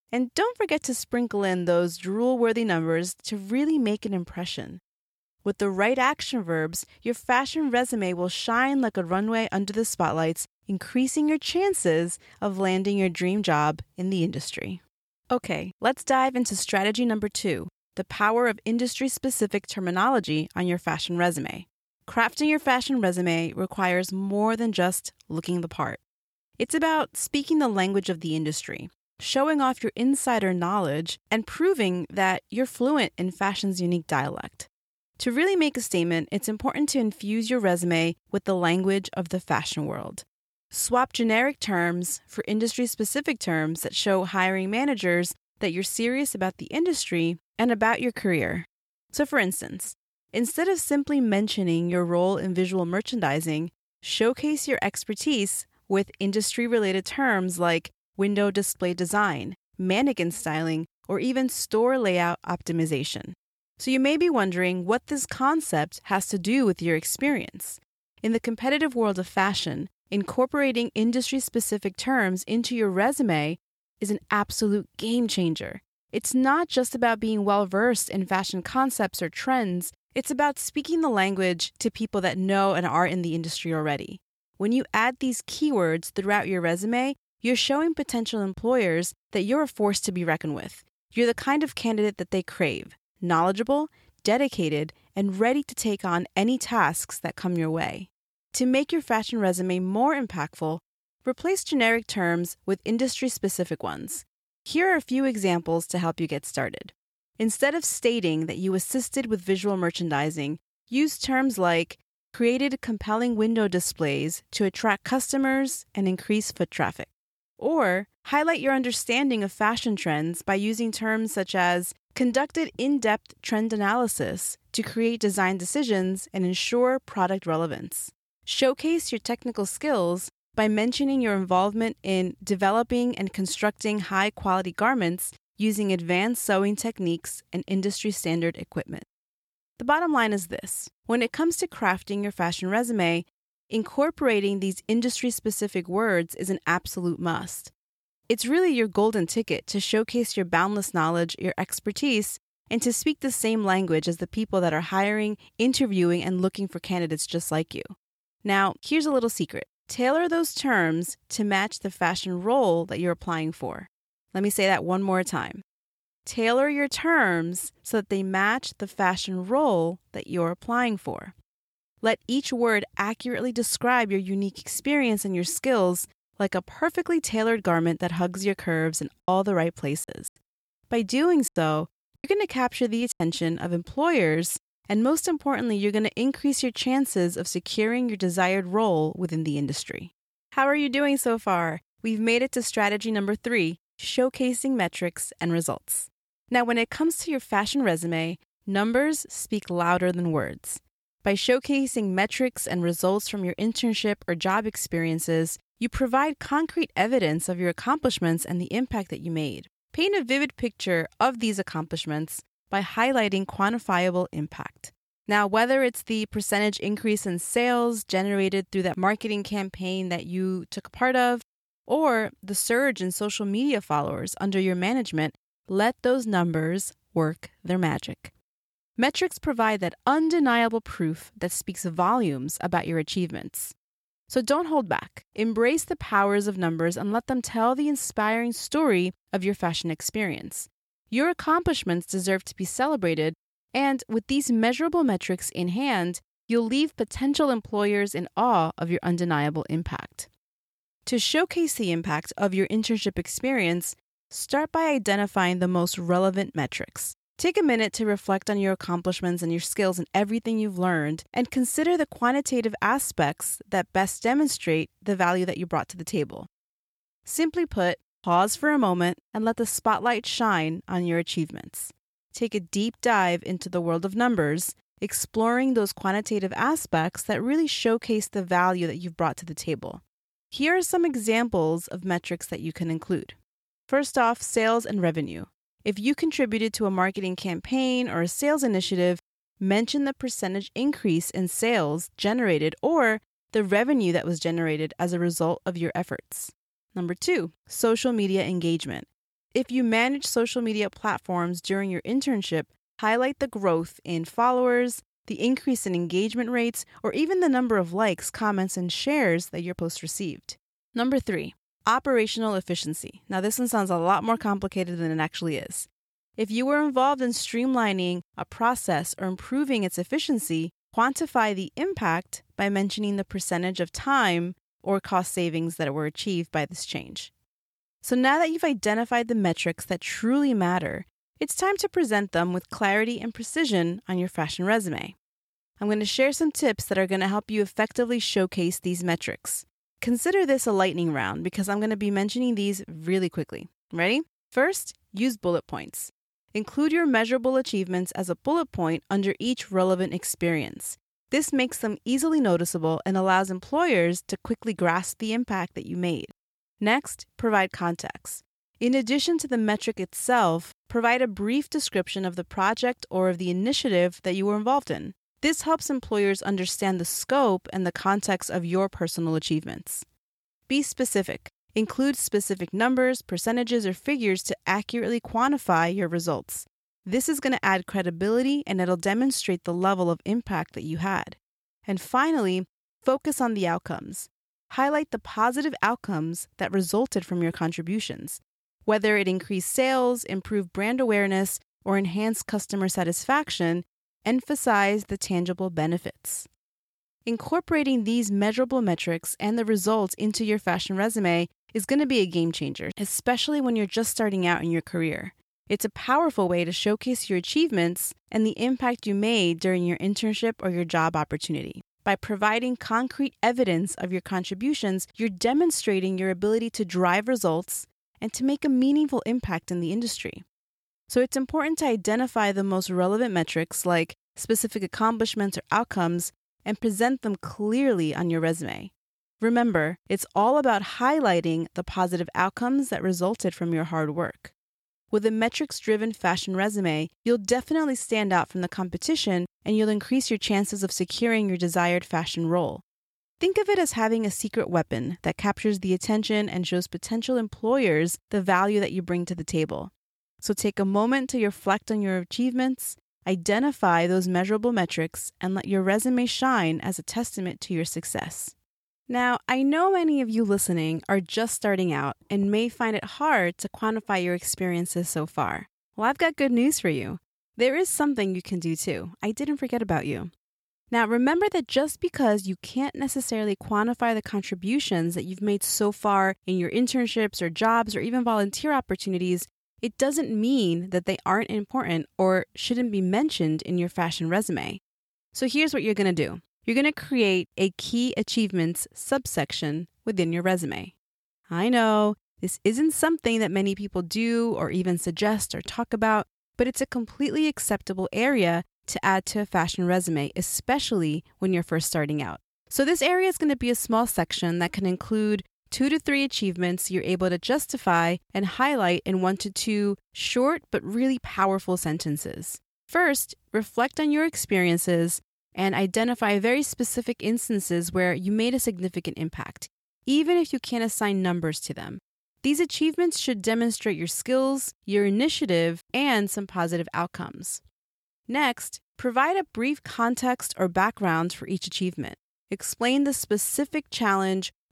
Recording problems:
choppy; very; from 2:59 to 3:03; 12% of the speech affected

